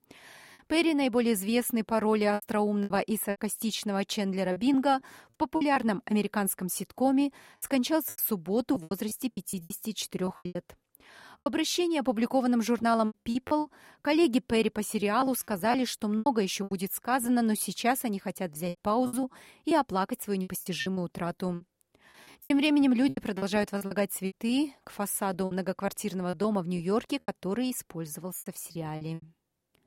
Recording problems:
choppy; very; 11% of the speech affected

